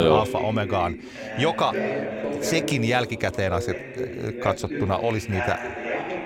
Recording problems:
background chatter; loud; throughout; 2 voices, 5 dB below the speech
abrupt cut into speech; at the start

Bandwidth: 16.5 kHz